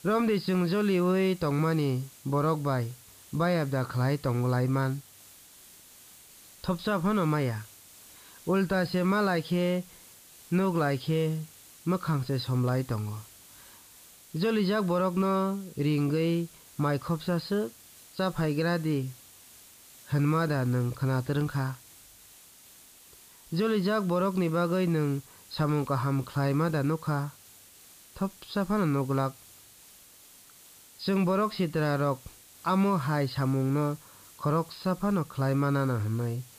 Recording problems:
high frequencies cut off; noticeable; nothing above 5 kHz
hiss; faint; throughout; 20 dB below the speech

